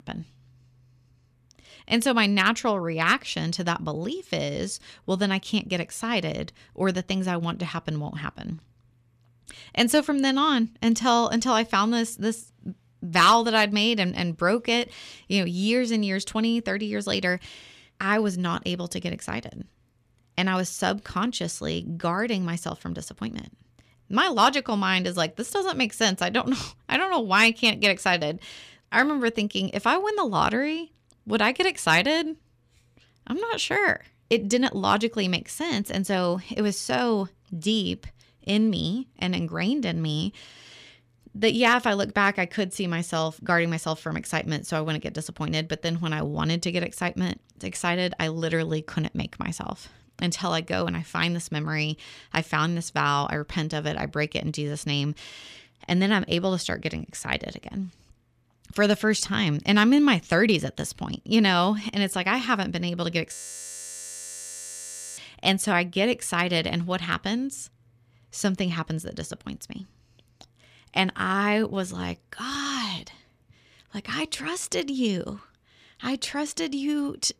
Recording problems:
audio freezing; at 1:03 for 2 s

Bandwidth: 14.5 kHz